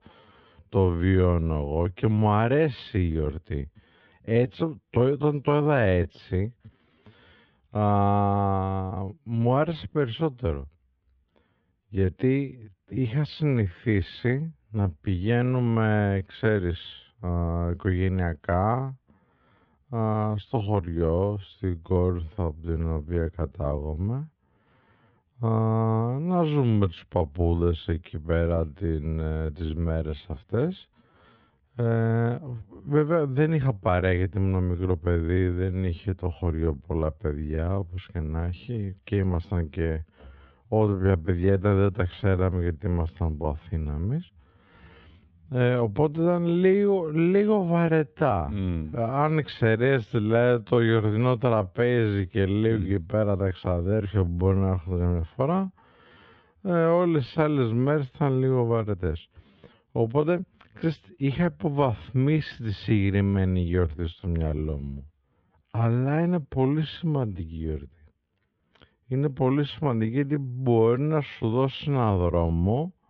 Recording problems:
muffled; very; fading above 3.5 kHz
wrong speed, natural pitch; too slow; 0.6 times normal speed

